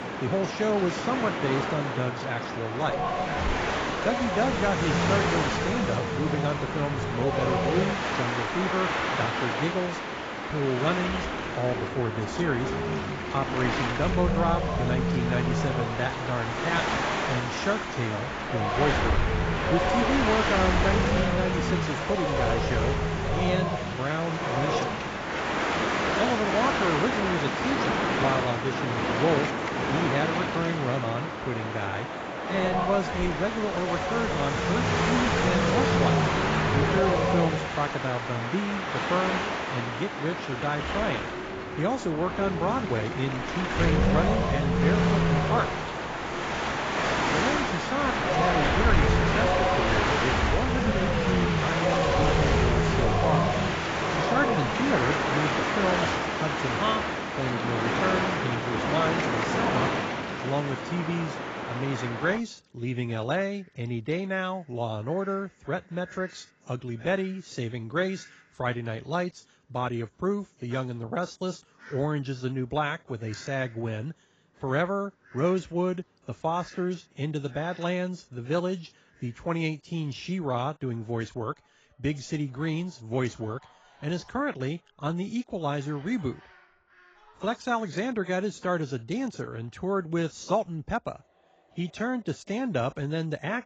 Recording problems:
garbled, watery; badly; nothing above 7.5 kHz
wind noise on the microphone; heavy; until 1:02; 4 dB above the speech
animal sounds; faint; throughout; 25 dB below the speech

